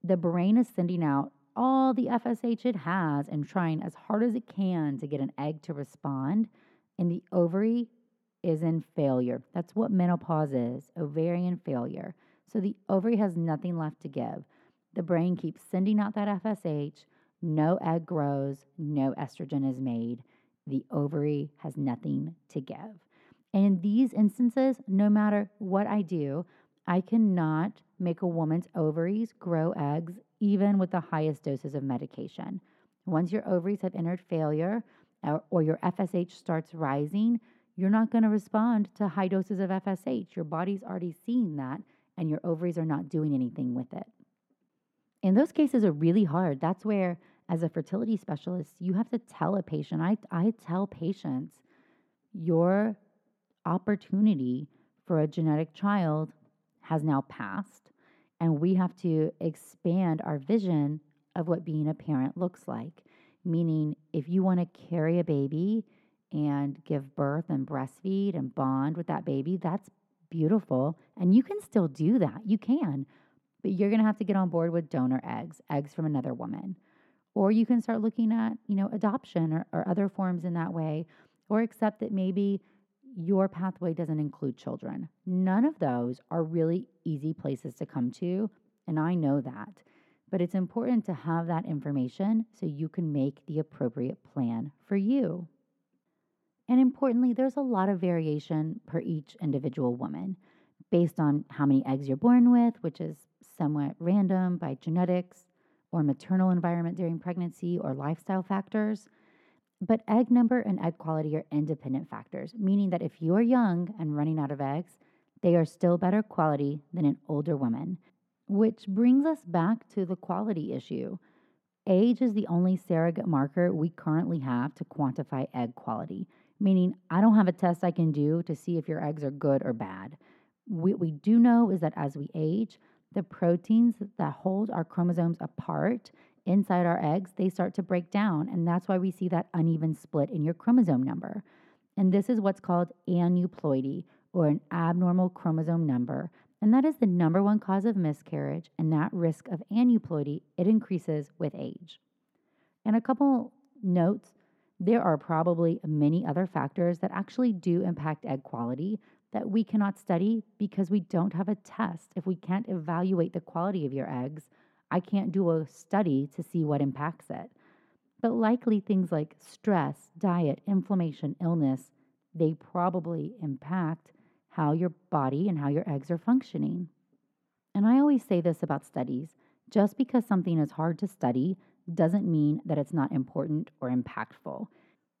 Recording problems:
muffled; very; fading above 2 kHz

